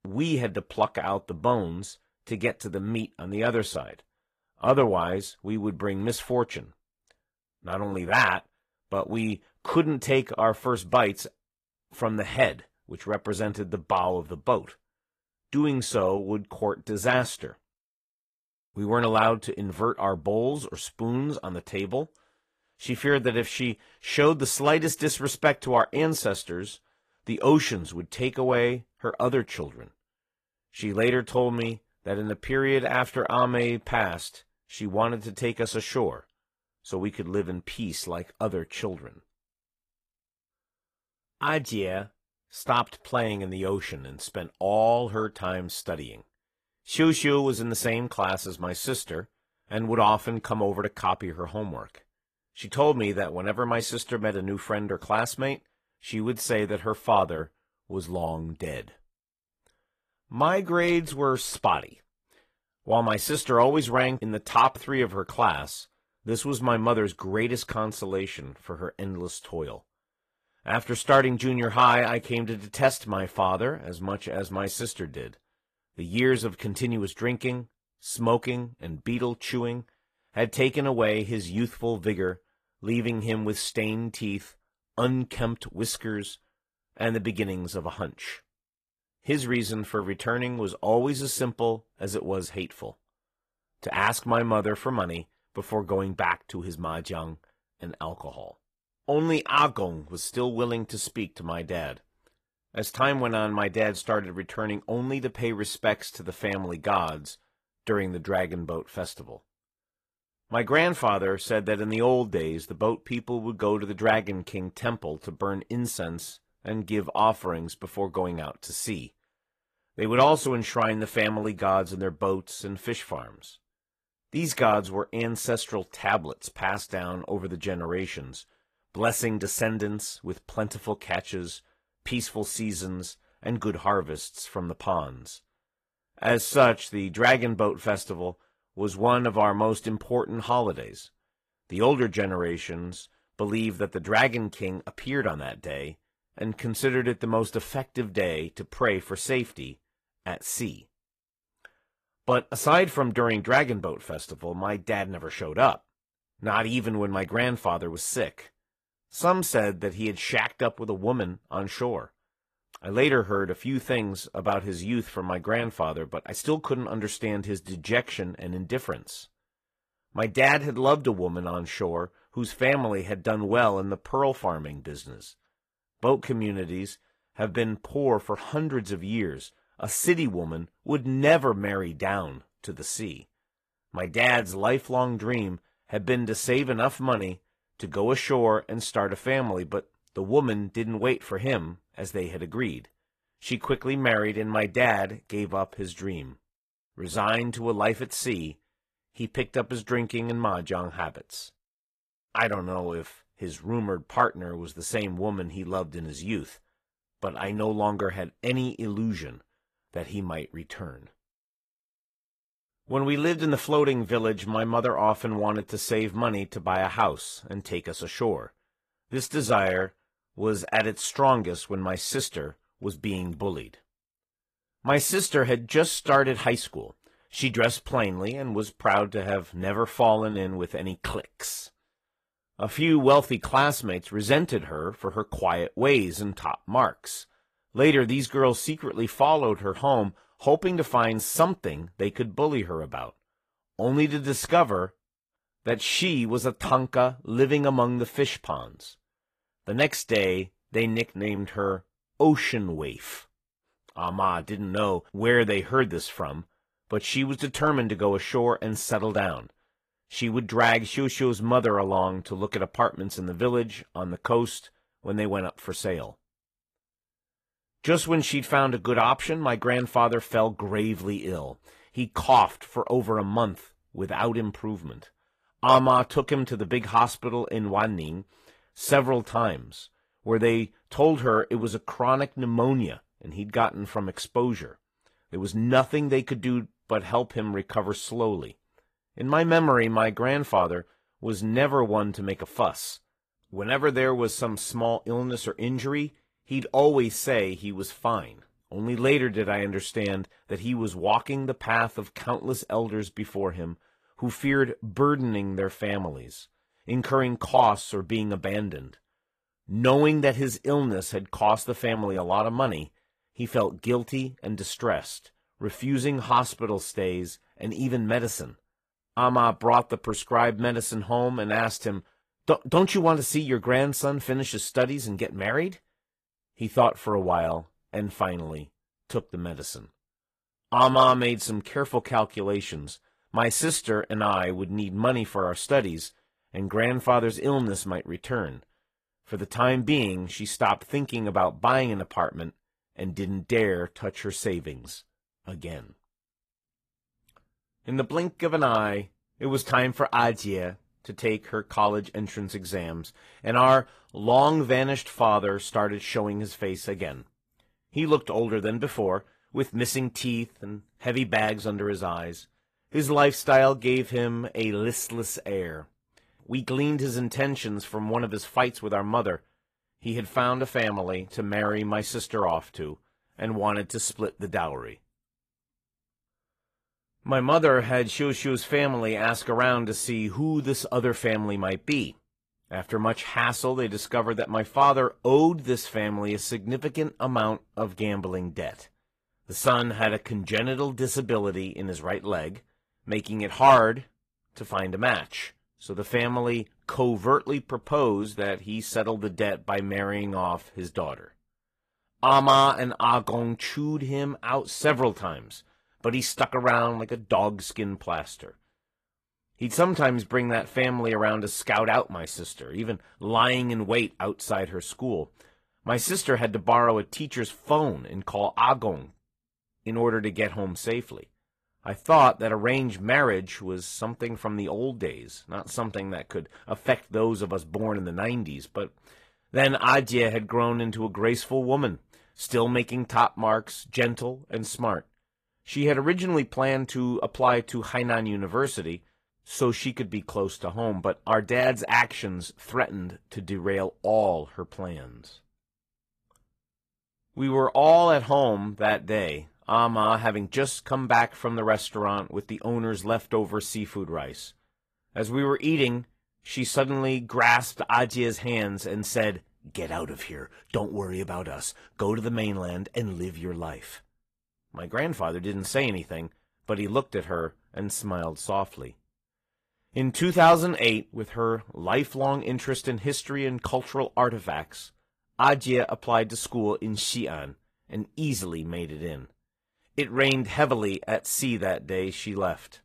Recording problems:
garbled, watery; slightly; nothing above 14.5 kHz

